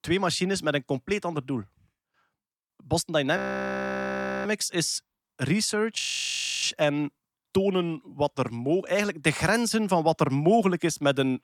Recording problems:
audio freezing; at 3.5 s for 1 s and at 6 s for 0.5 s

